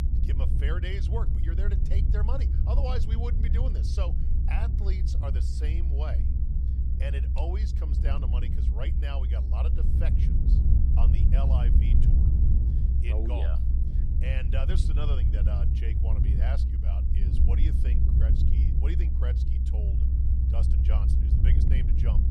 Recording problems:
low rumble; loud; throughout; 2 dB below the speech

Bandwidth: 15 kHz